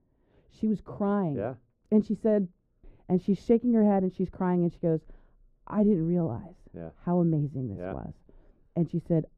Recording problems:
muffled; very; fading above 1.5 kHz

